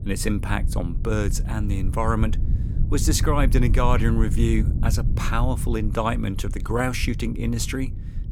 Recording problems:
low rumble; noticeable; throughout; 15 dB below the speech

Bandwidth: 18.5 kHz